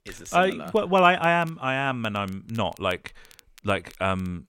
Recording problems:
crackle, like an old record; faint; 30 dB below the speech

